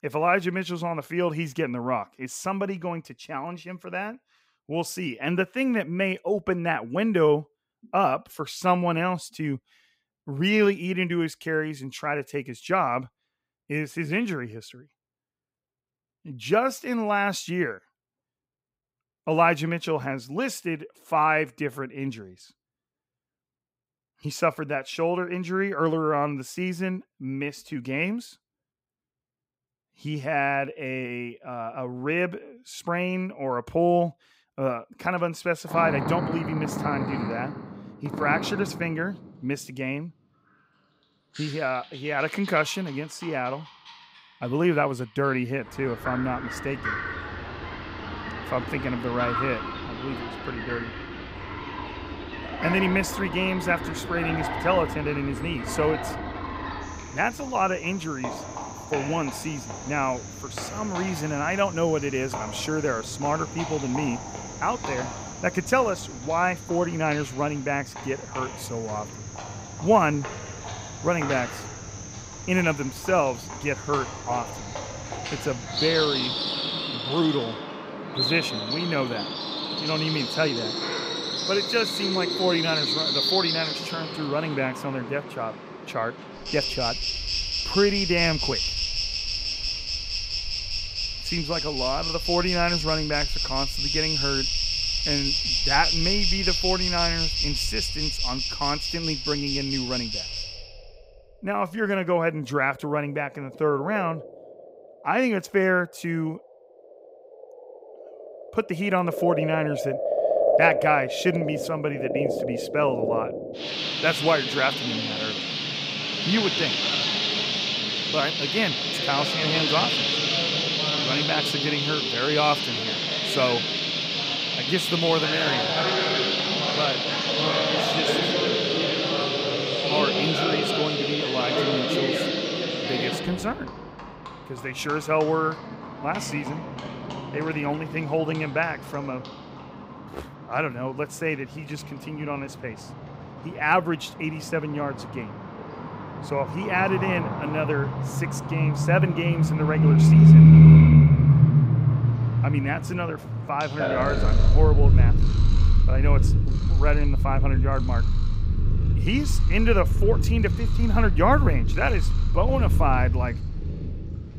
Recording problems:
animal sounds; very loud; from 35 s on; 3 dB above the speech

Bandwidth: 15.5 kHz